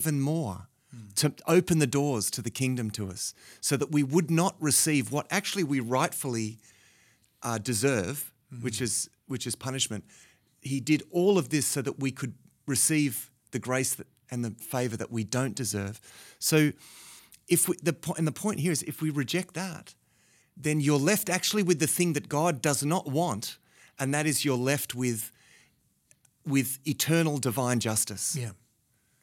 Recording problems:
abrupt cut into speech; at the start

